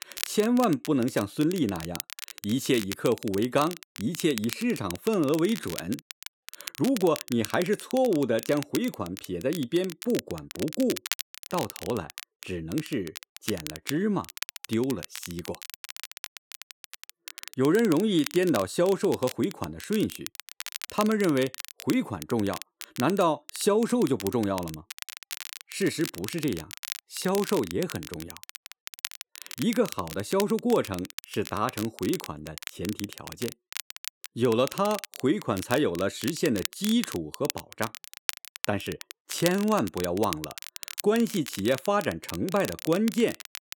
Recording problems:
crackle, like an old record; noticeable; 10 dB below the speech

